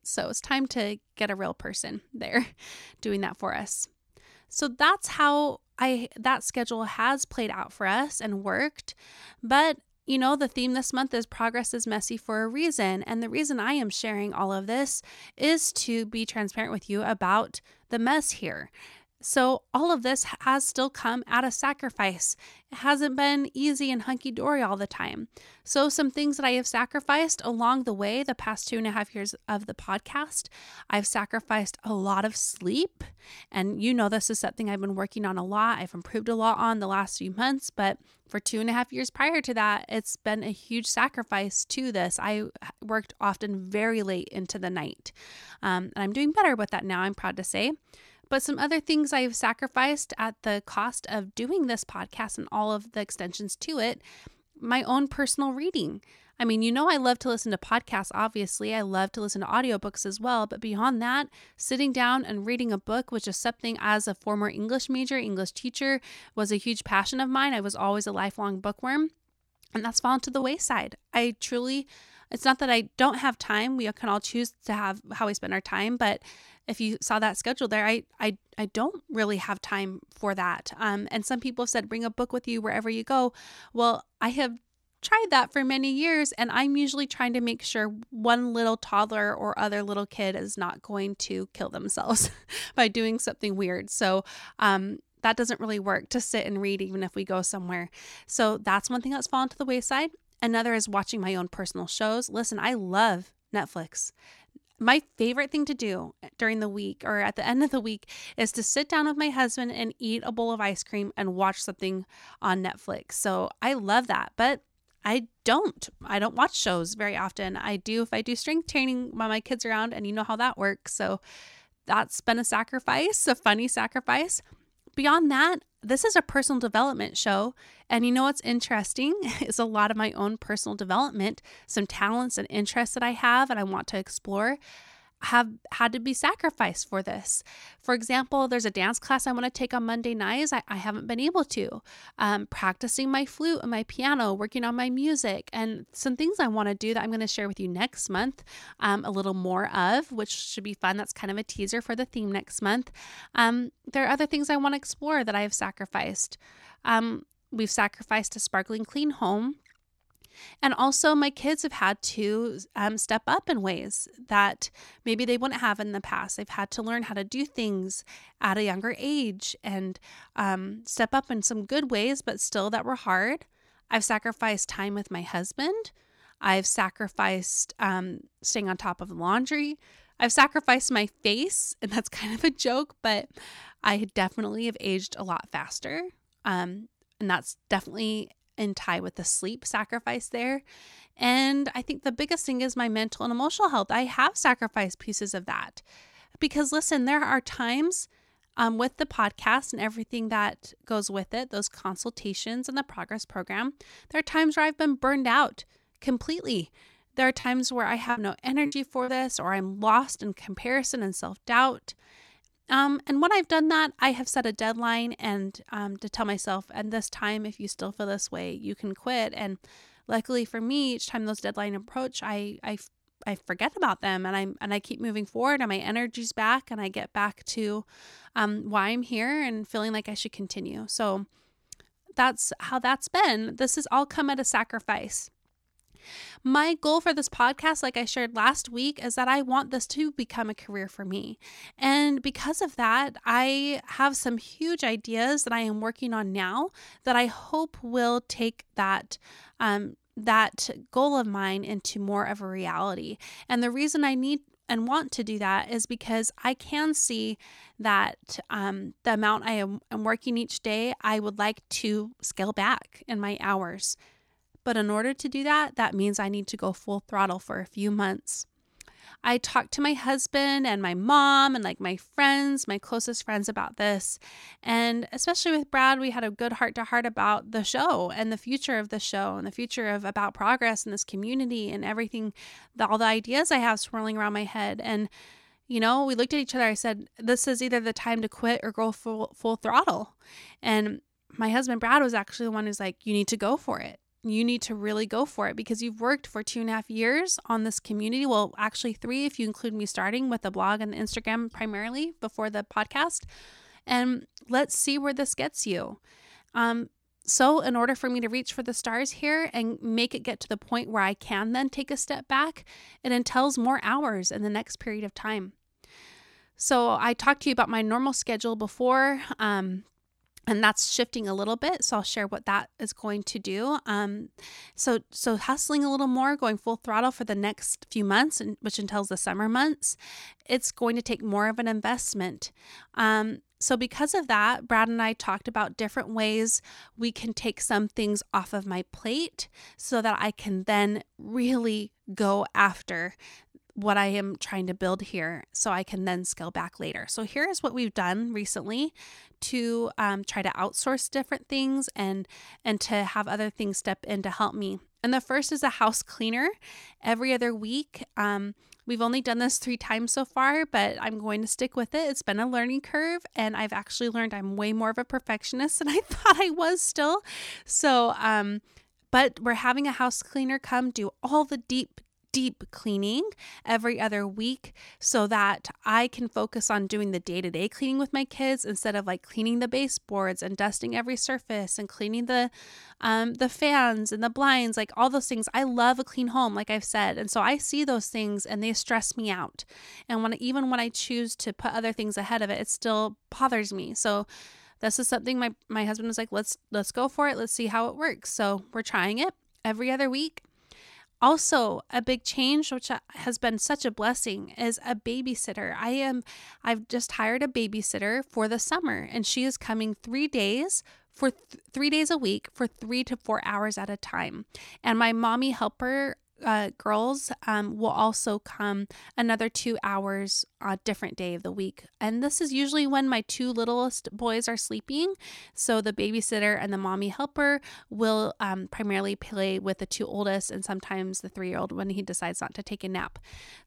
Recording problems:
choppy; very; from 3:27 to 3:29; 9% of the speech affected

